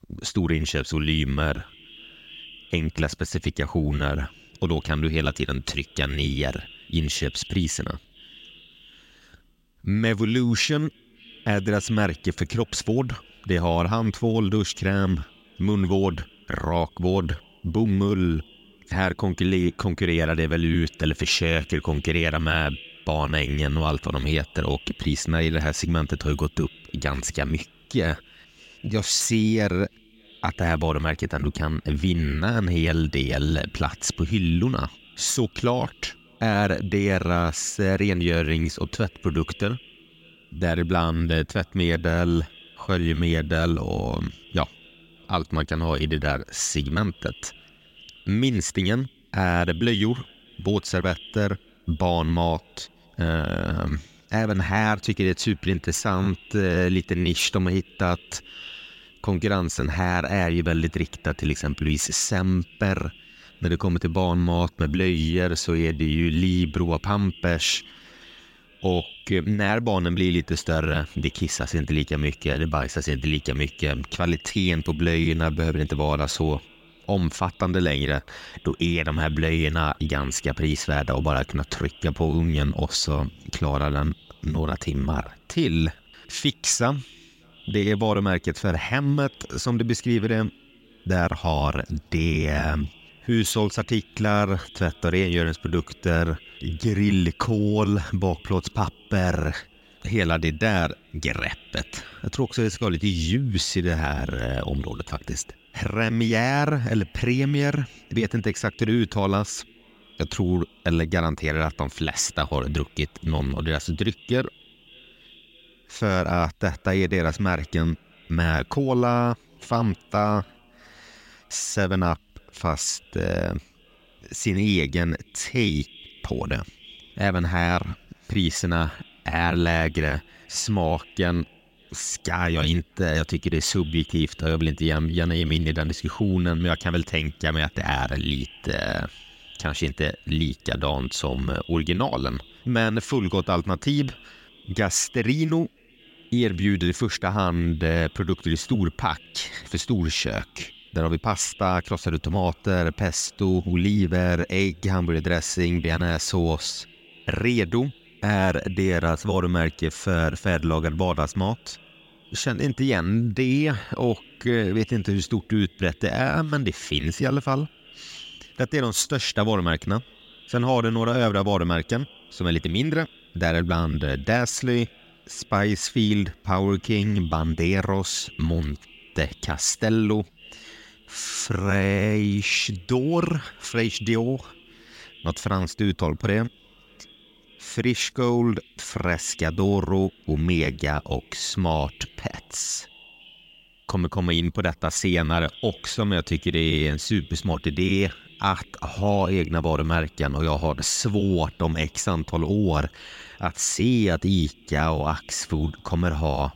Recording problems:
echo of what is said; faint; throughout; 590 ms later, 25 dB below the speech

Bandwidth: 16 kHz